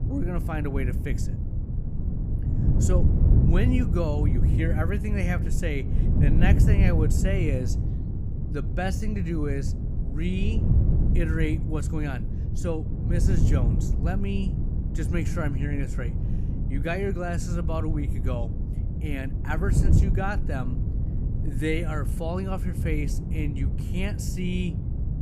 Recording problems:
wind noise on the microphone; heavy; 5 dB below the speech

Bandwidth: 15 kHz